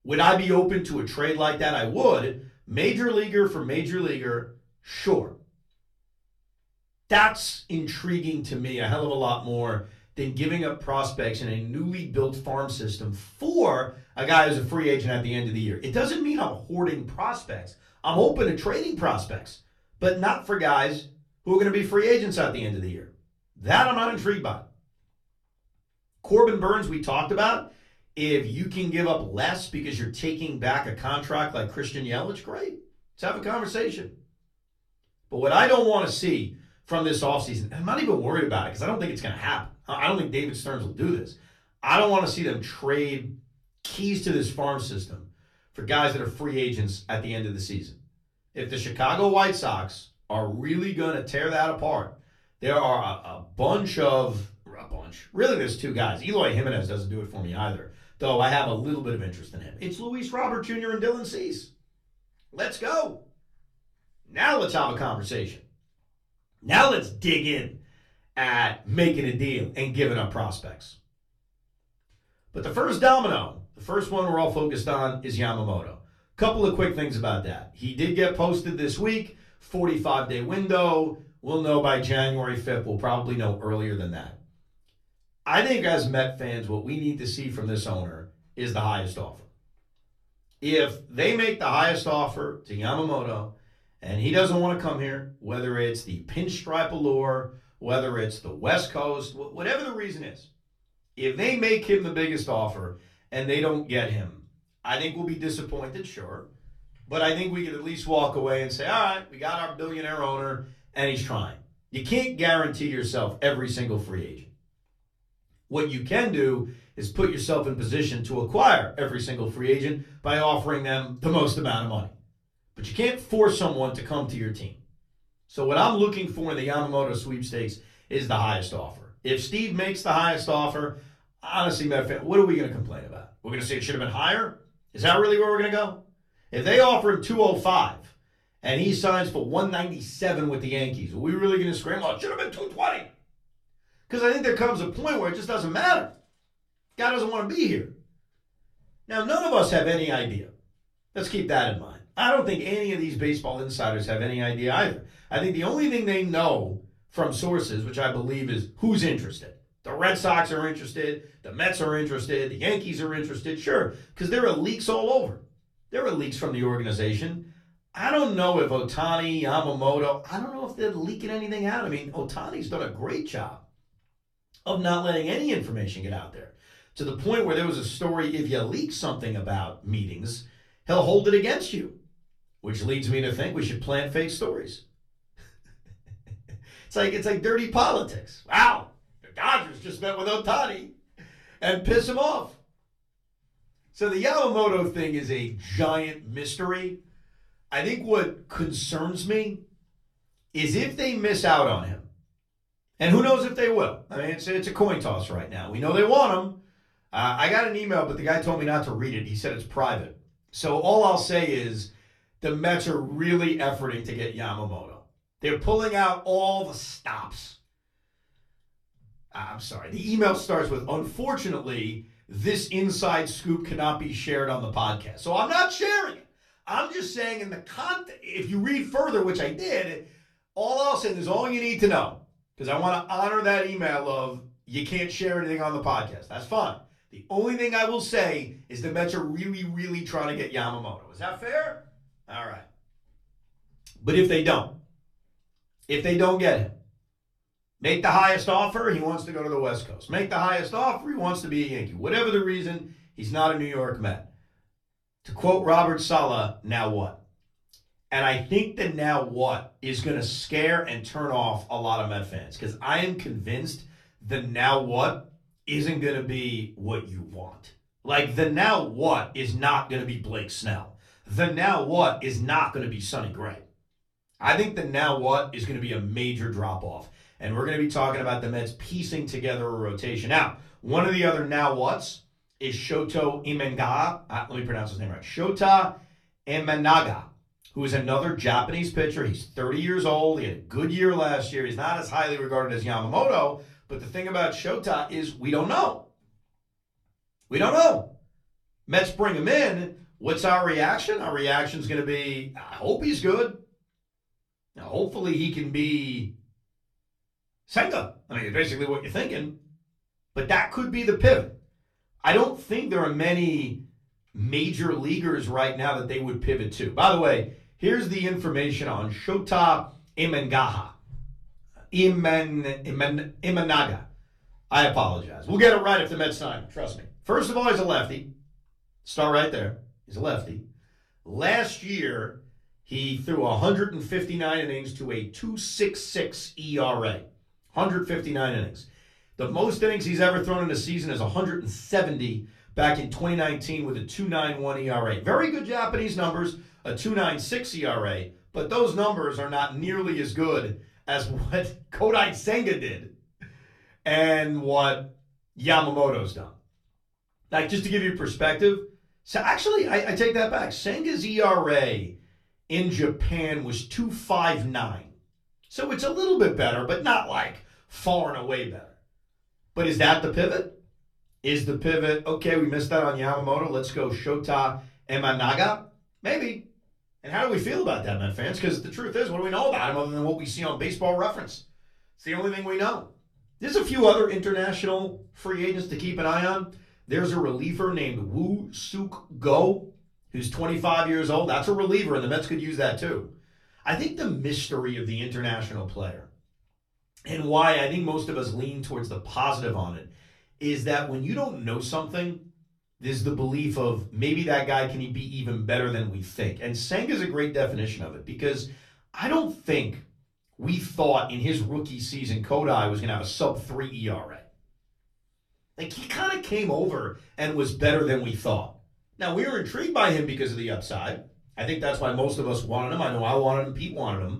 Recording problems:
off-mic speech; far
room echo; very slight; dies away in 0.3 s

